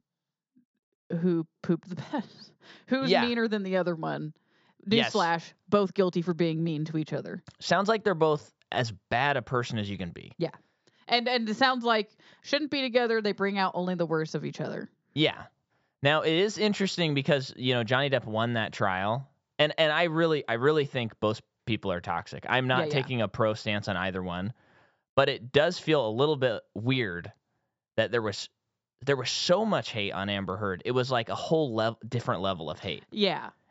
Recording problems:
high frequencies cut off; noticeable; nothing above 8 kHz

